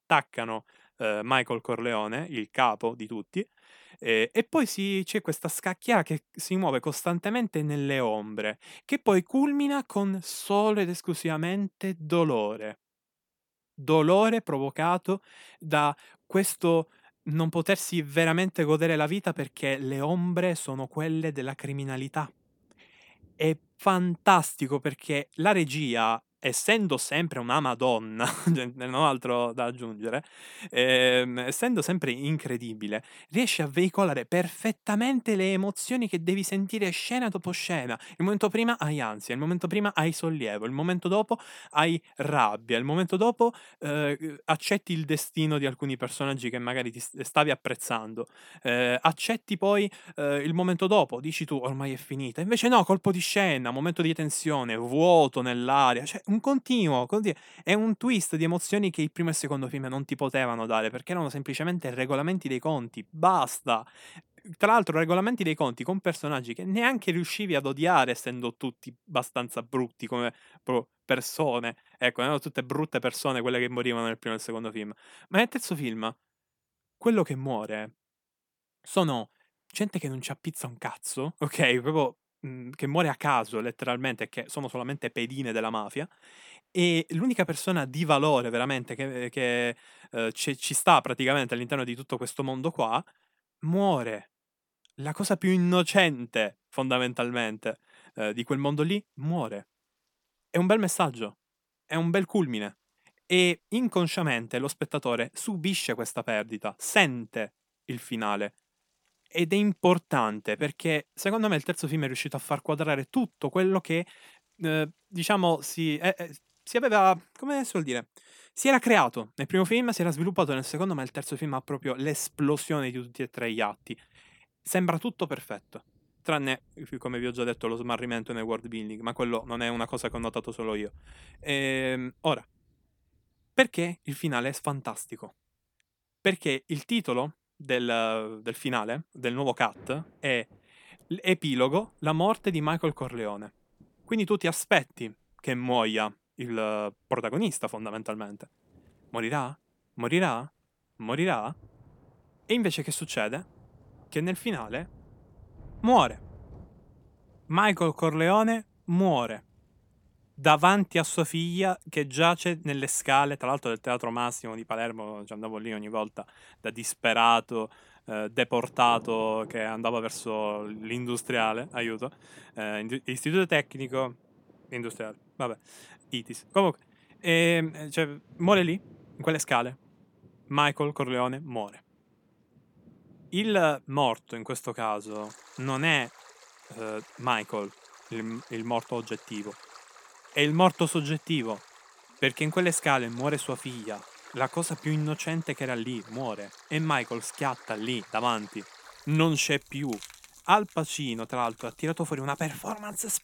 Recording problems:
rain or running water; faint; throughout; 25 dB below the speech

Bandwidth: 18.5 kHz